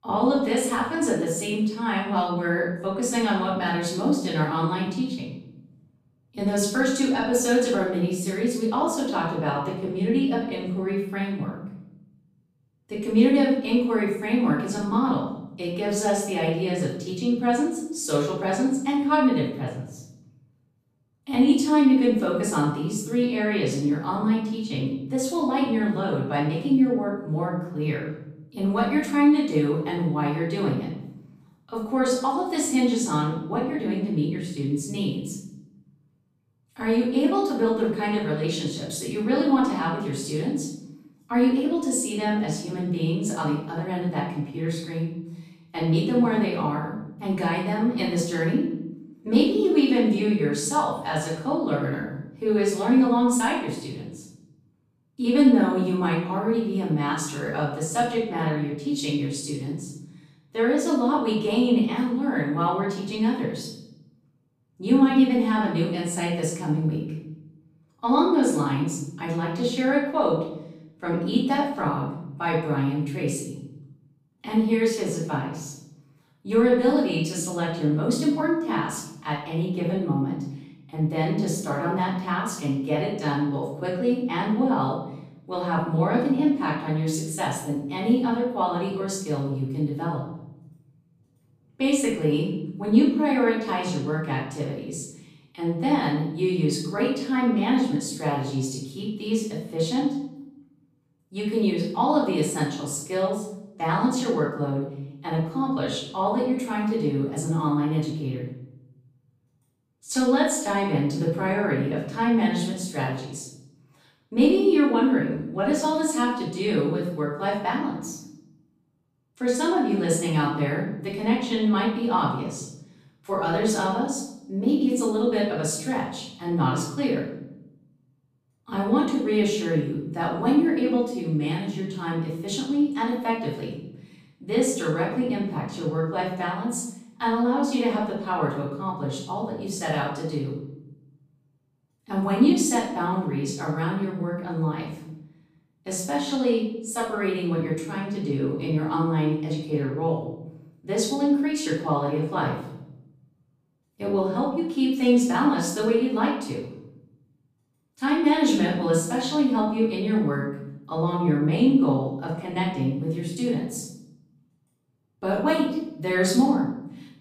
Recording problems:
off-mic speech; far
room echo; noticeable; dies away in 0.8 s

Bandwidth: 15 kHz